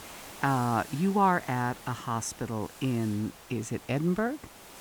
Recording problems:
hiss; noticeable; throughout; 15 dB below the speech

